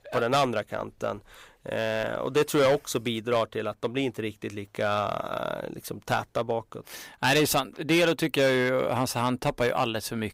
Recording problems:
distortion; slight; 4% of the sound clipped

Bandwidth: 15.5 kHz